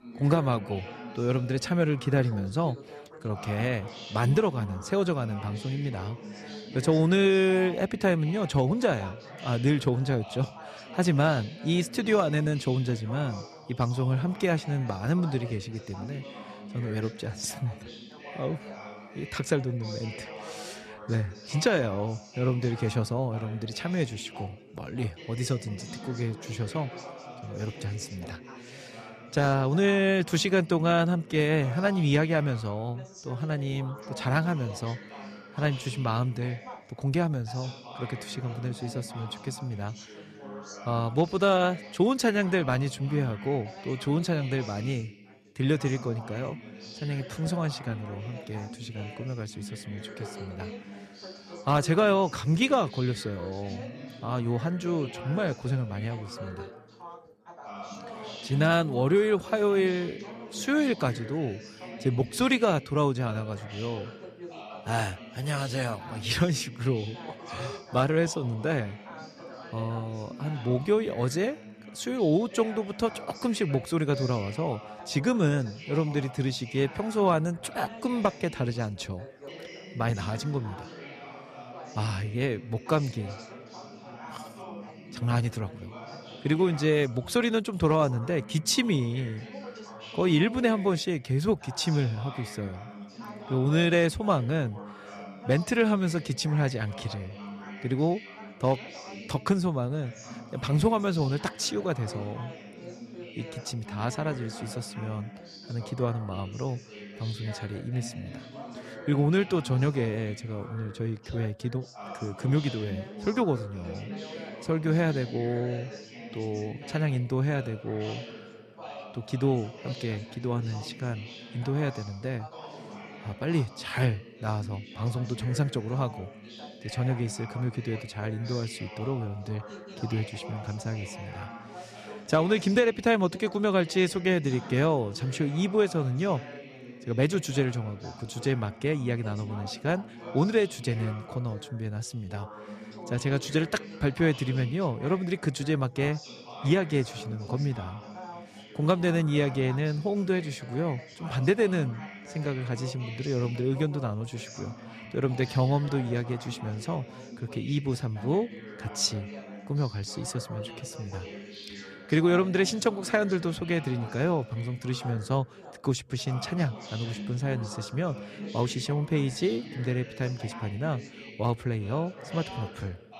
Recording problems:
background chatter; noticeable; throughout; 4 voices, 15 dB below the speech

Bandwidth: 14.5 kHz